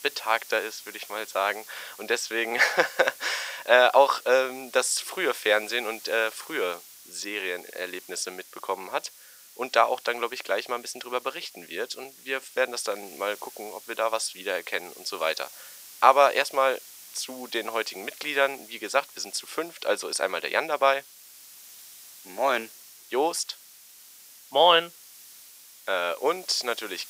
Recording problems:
thin; very; fading below 500 Hz
hiss; noticeable; throughout; 20 dB below the speech

